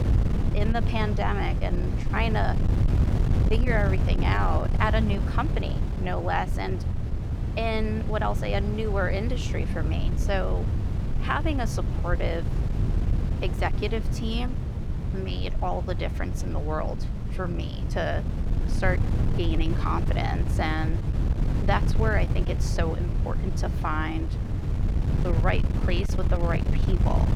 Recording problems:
wind noise on the microphone; heavy; 8 dB below the speech

